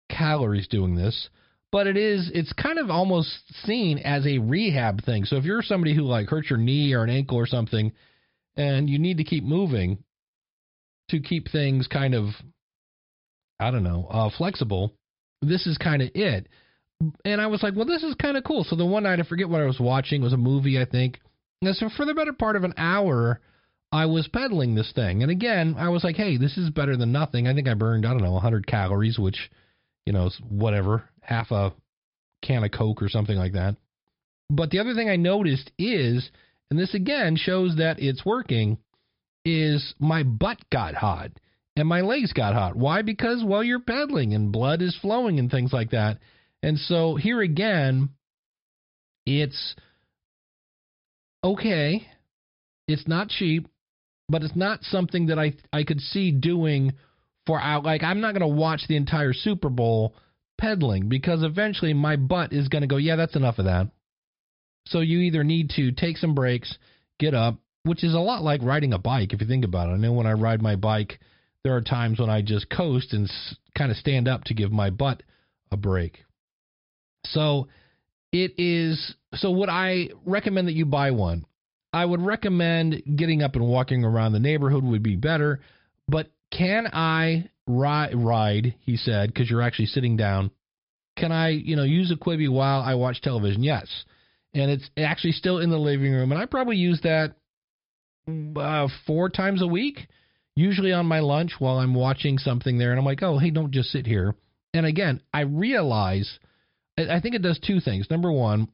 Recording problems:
high frequencies cut off; noticeable; nothing above 5.5 kHz

